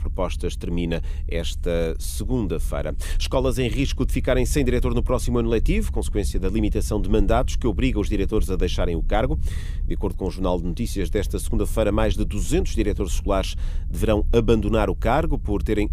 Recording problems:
low rumble; faint; throughout; 25 dB below the speech

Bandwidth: 15 kHz